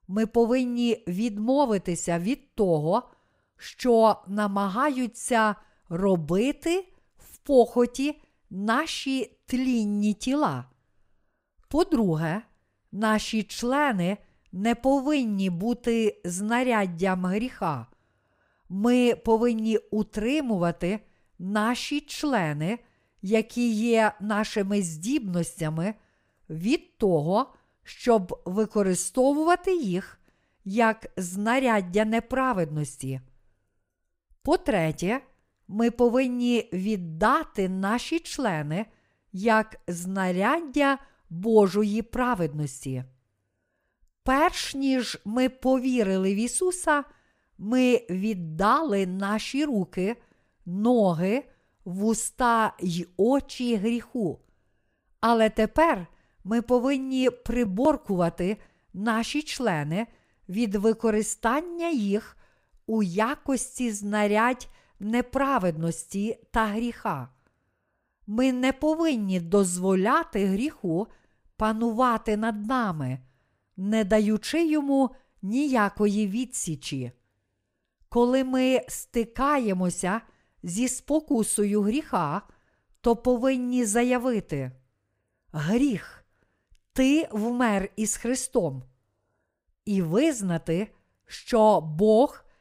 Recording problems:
none

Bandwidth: 15.5 kHz